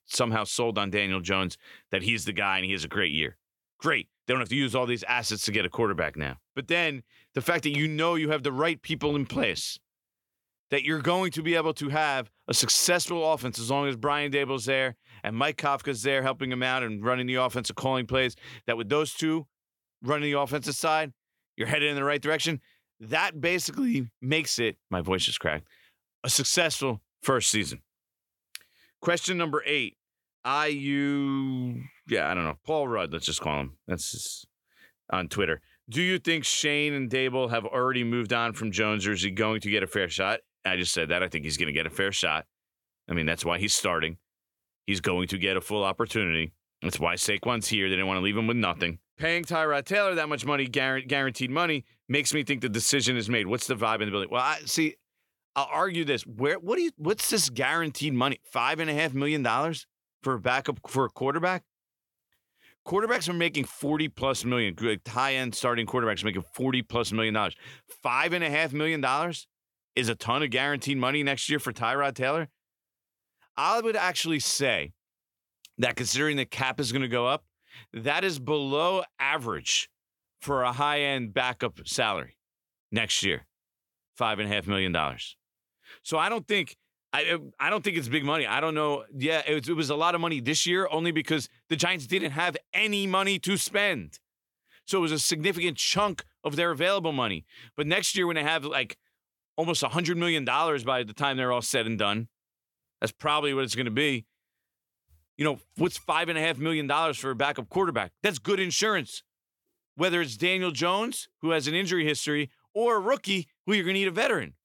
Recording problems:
none

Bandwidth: 17.5 kHz